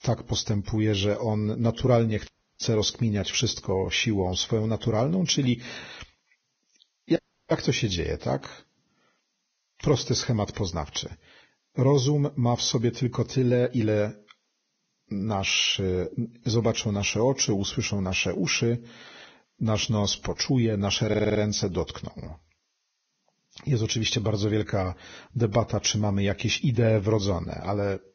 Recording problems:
garbled, watery; badly; nothing above 6.5 kHz
audio cutting out; at 2.5 s and at 7 s
audio stuttering; at 21 s

